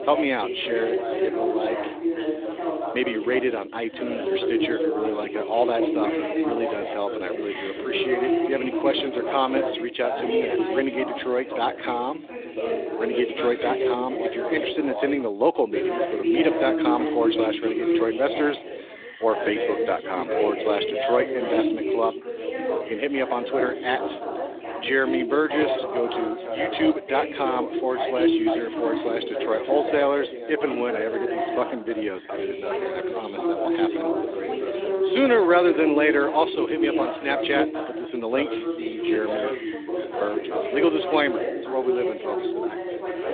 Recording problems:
phone-call audio
background chatter; loud; throughout; 3 voices, 1 dB below the speech

